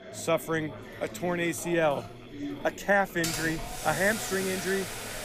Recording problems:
household noises; loud; throughout; 5 dB below the speech
chatter from many people; noticeable; throughout; 15 dB below the speech
machinery noise; faint; throughout; 25 dB below the speech

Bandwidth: 15 kHz